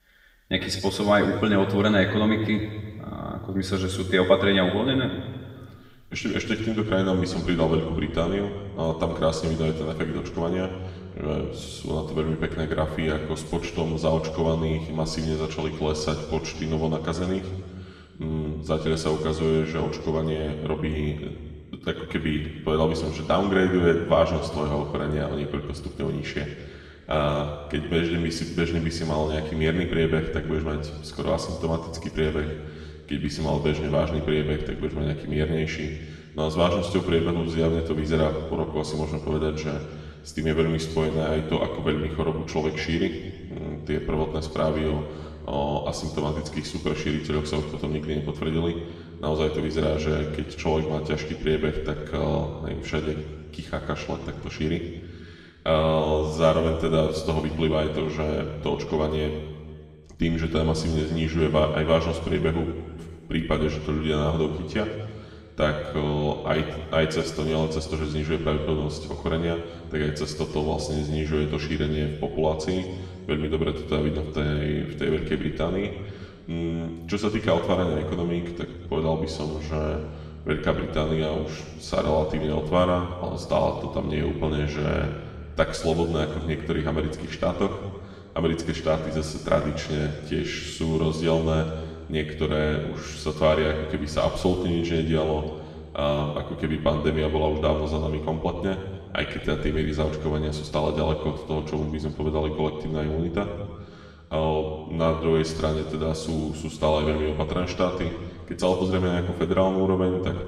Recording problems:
room echo; noticeable; dies away in 1.8 s
off-mic speech; somewhat distant

